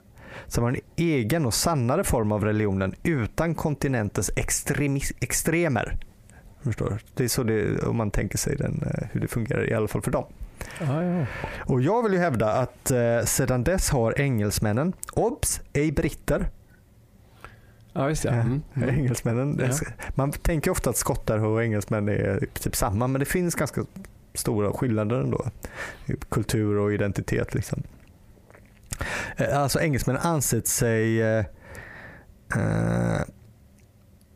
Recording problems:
squashed, flat; heavily

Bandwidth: 15 kHz